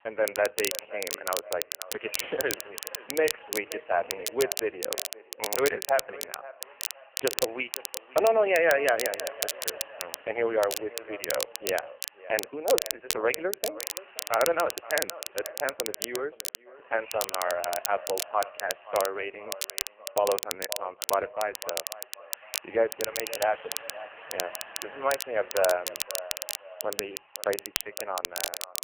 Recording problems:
phone-call audio; poor line
echo of what is said; noticeable; throughout; 520 ms later, 15 dB below the speech
crackle, like an old record; loud; 4 dB below the speech
machinery noise; faint; throughout; 20 dB below the speech

